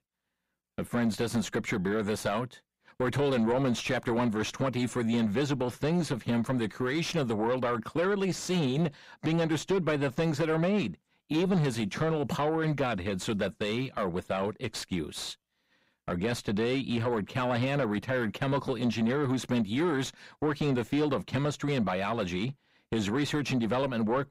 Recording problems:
distortion; slight; 9 dB below the speech

